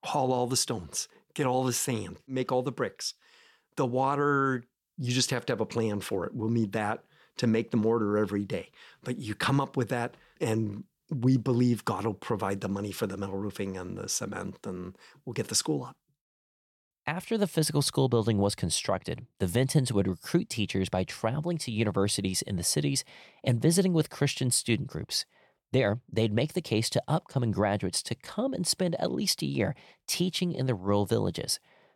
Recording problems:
none

